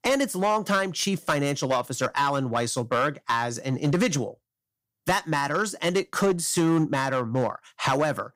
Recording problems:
distortion; slight; 6% of the sound clipped

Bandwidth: 15.5 kHz